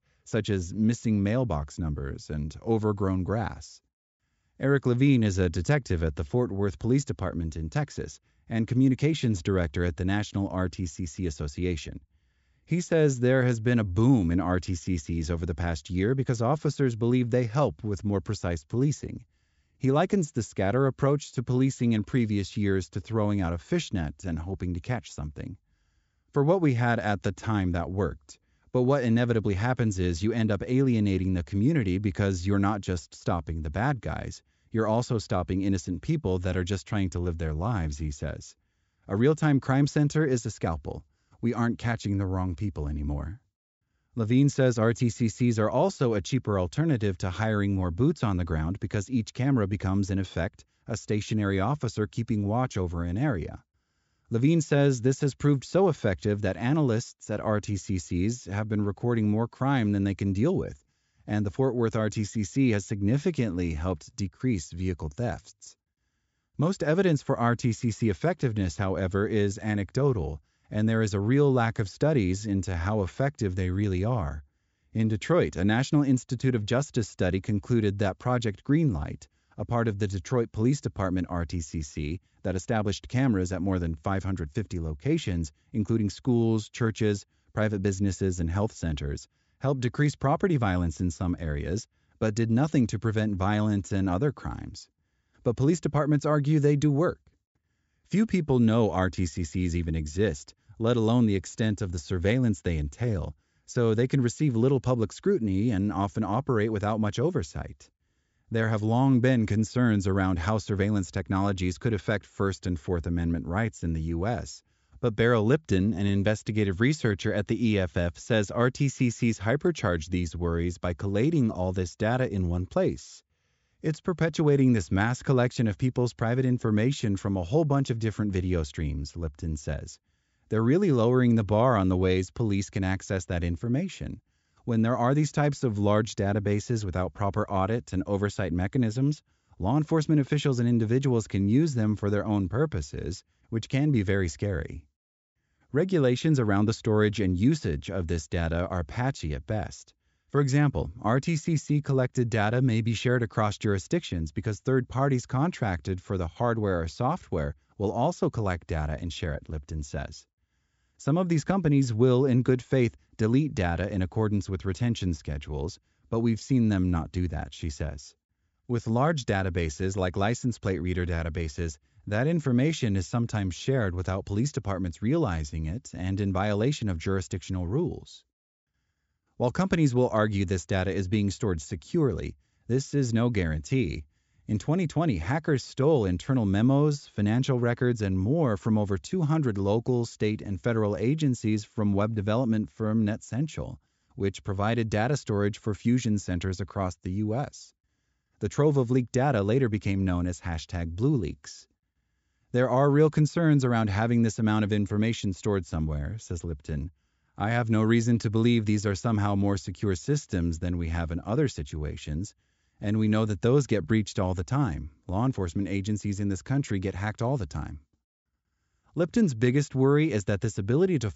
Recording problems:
high frequencies cut off; noticeable; nothing above 8 kHz

